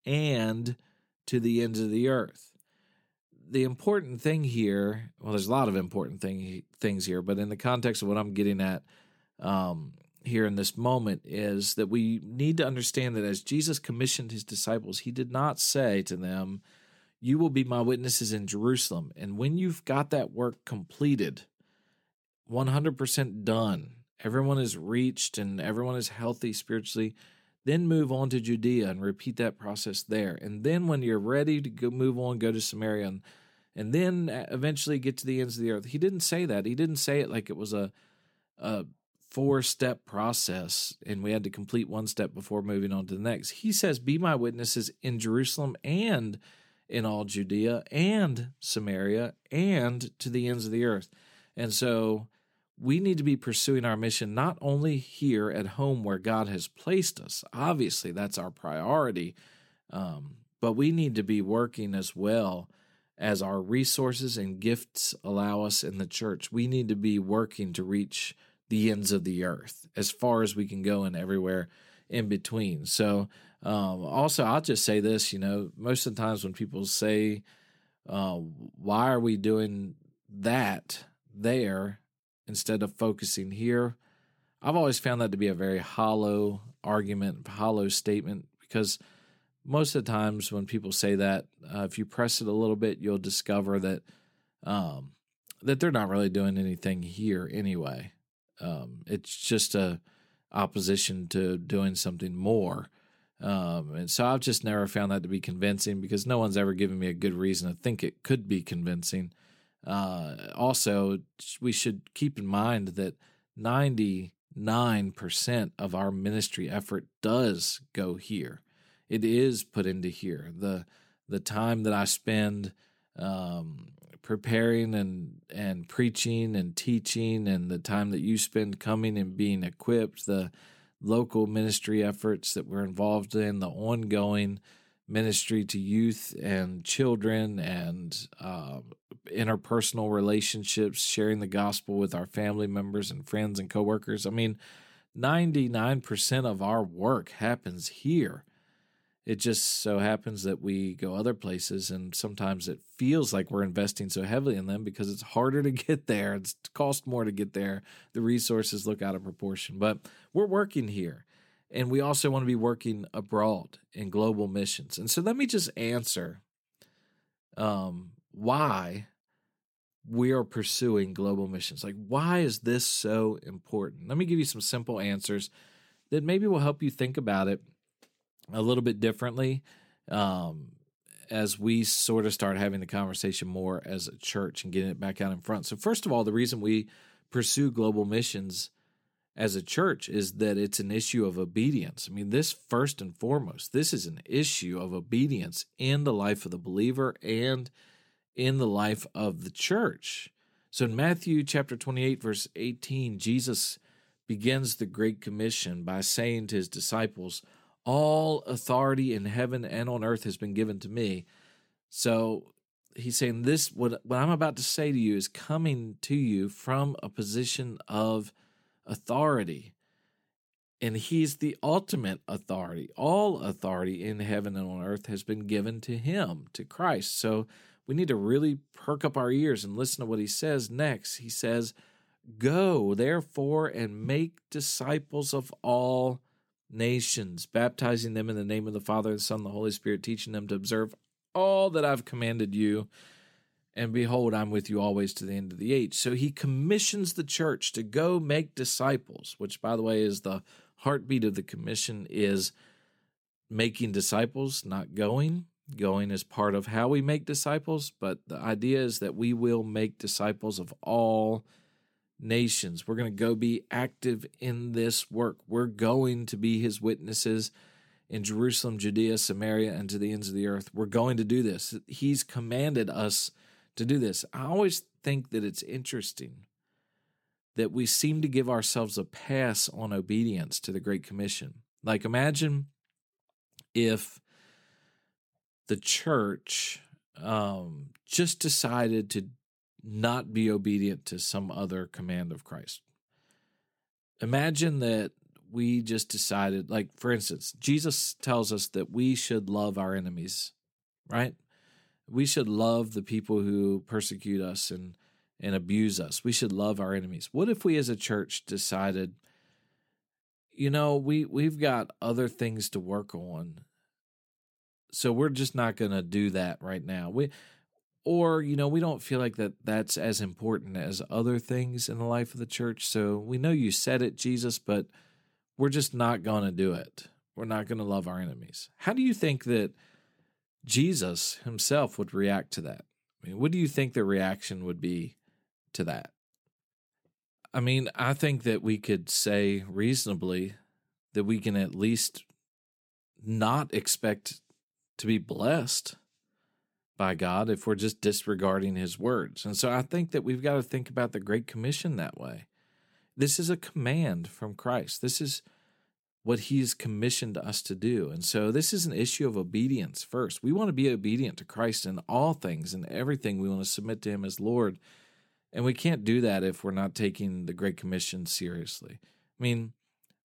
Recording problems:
none

